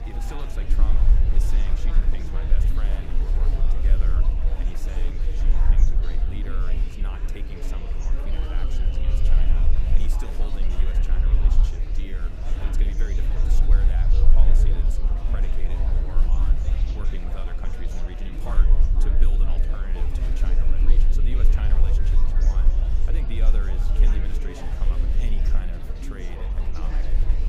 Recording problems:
murmuring crowd; very loud; throughout; 2 dB above the speech
low rumble; loud; throughout; 4 dB below the speech

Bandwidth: 15.5 kHz